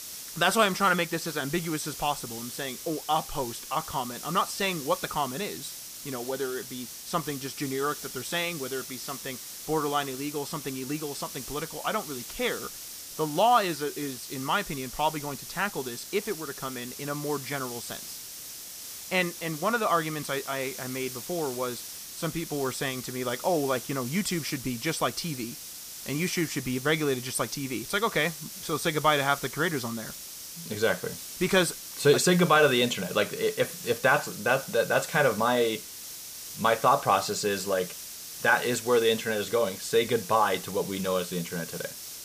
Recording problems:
hiss; loud; throughout; 10 dB below the speech

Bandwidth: 15 kHz